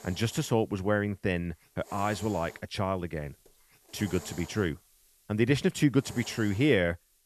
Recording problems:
hiss; noticeable; throughout; 20 dB below the speech

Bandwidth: 13.5 kHz